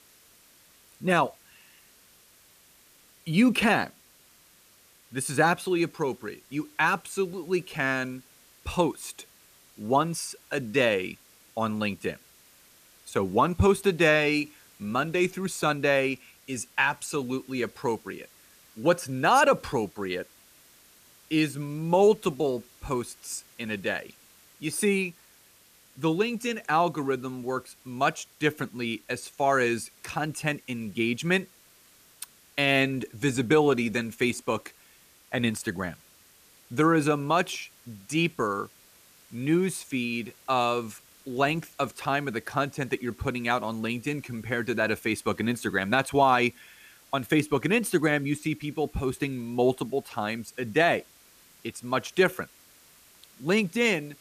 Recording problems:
hiss; faint; throughout; 25 dB below the speech

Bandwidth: 14.5 kHz